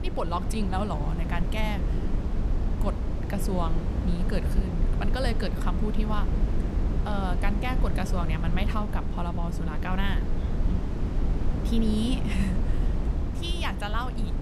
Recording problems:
wind noise on the microphone; heavy; 6 dB below the speech

